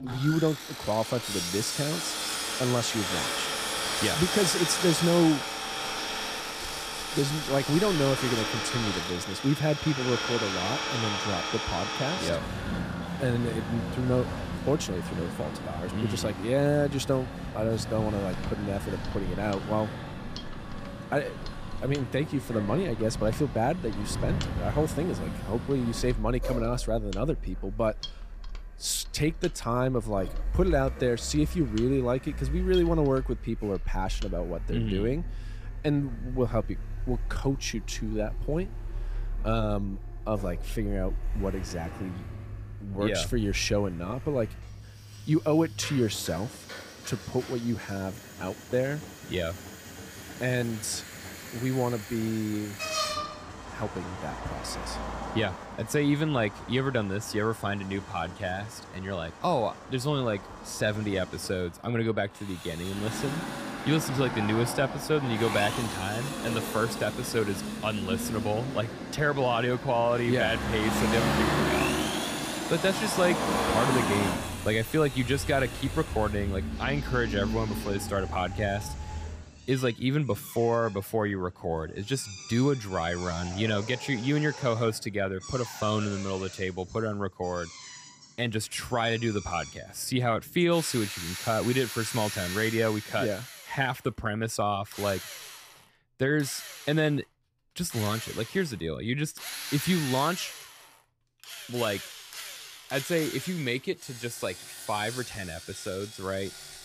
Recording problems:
traffic noise; loud; until 1:19; 5 dB below the speech
machinery noise; noticeable; throughout; 10 dB below the speech

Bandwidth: 15 kHz